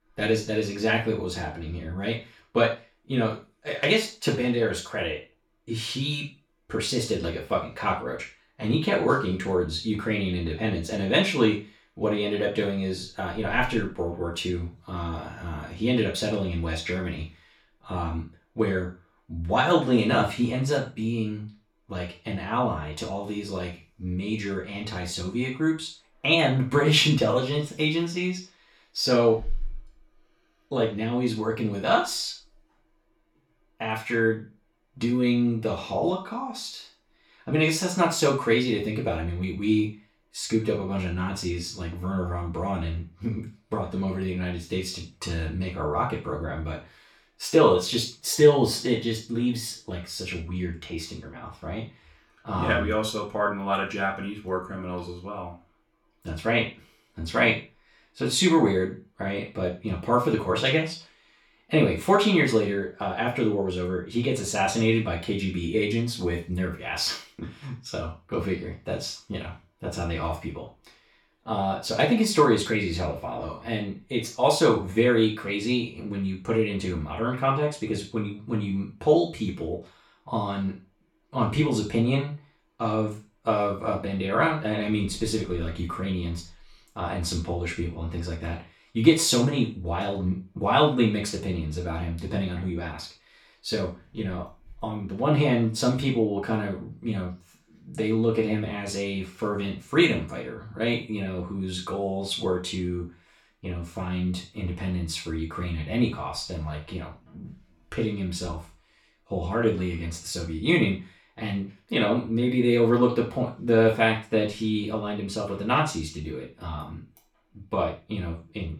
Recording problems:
off-mic speech; far
room echo; slight; dies away in 0.3 s

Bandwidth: 17.5 kHz